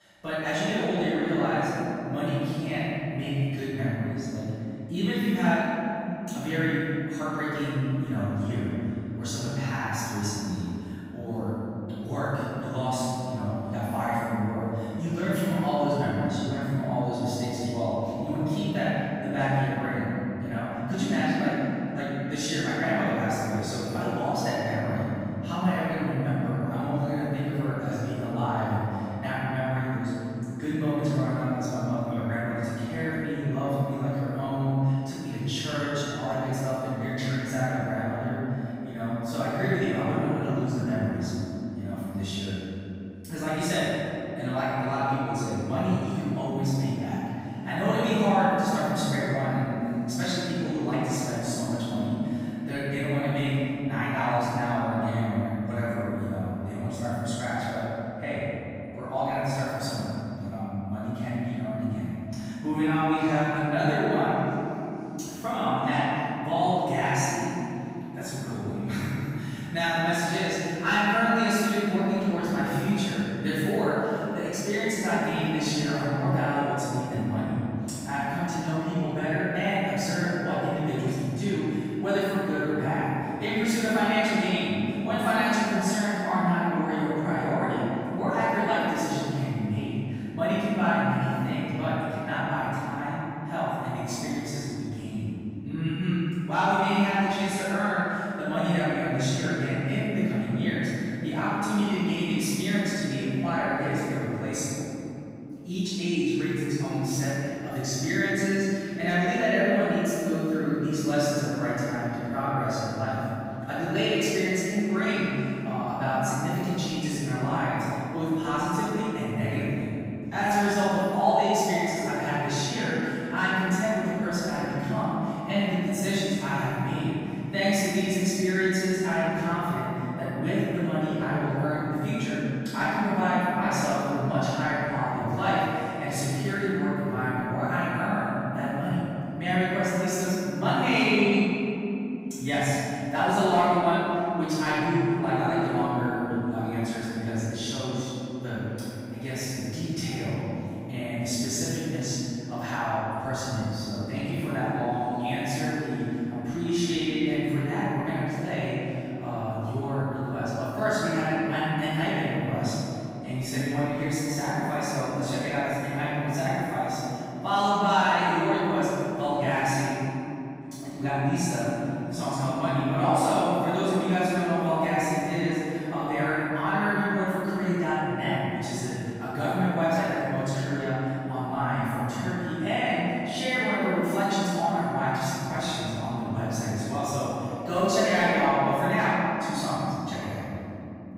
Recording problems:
room echo; strong; dies away in 3 s
off-mic speech; far

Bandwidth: 15.5 kHz